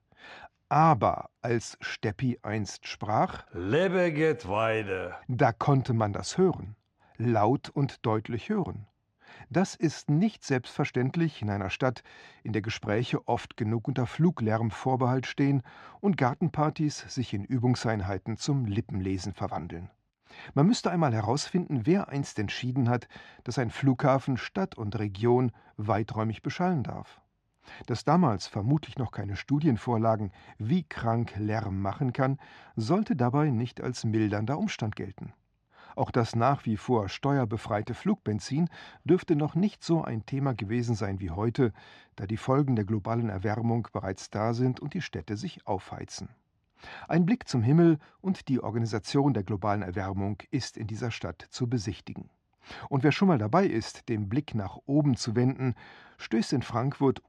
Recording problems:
muffled; slightly; fading above 4.5 kHz

